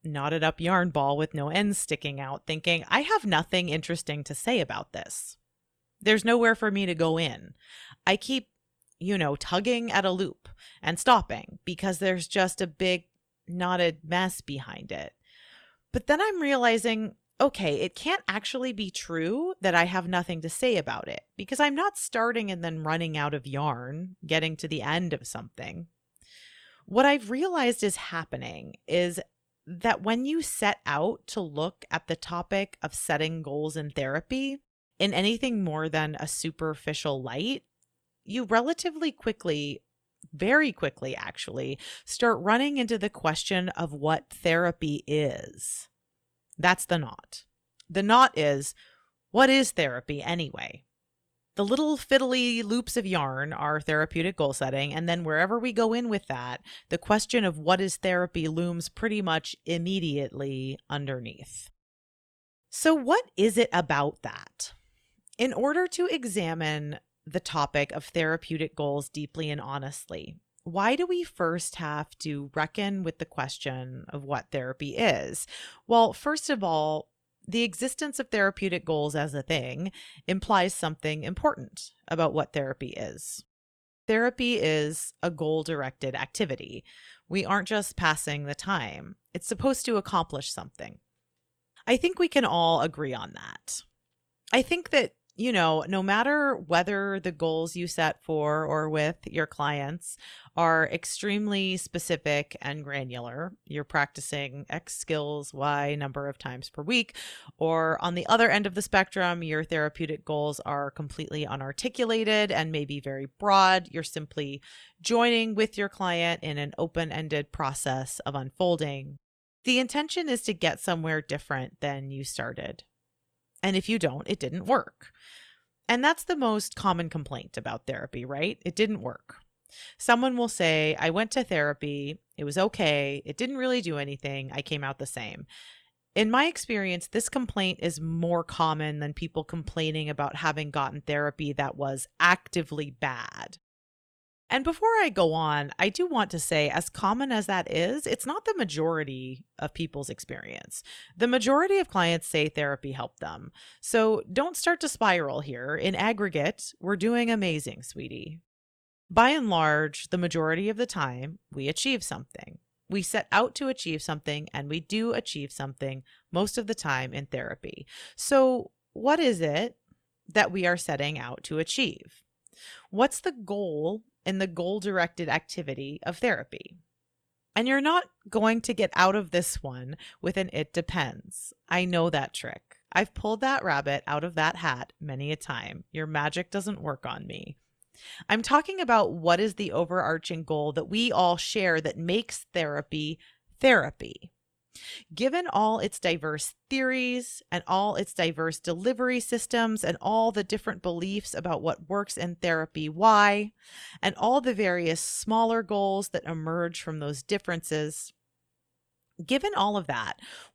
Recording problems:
none

